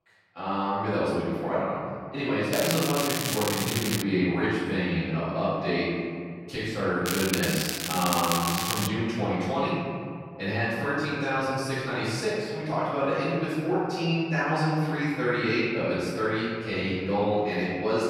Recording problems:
room echo; strong; dies away in 2 s
off-mic speech; far
crackling; loud; from 2.5 to 4 s and from 7 to 9 s; 2 dB below the speech

